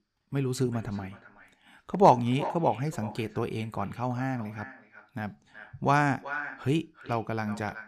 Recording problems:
echo of what is said; noticeable; throughout; 370 ms later, 15 dB below the speech

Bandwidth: 15 kHz